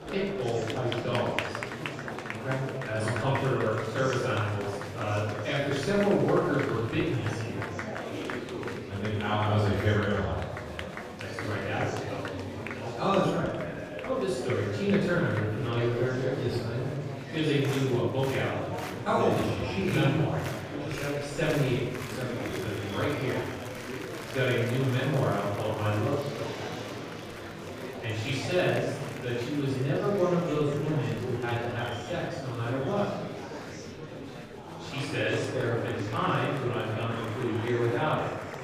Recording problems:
room echo; strong; dies away in 1 s
off-mic speech; far
murmuring crowd; loud; throughout; 7 dB below the speech
background music; faint; throughout; 20 dB below the speech

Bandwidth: 15 kHz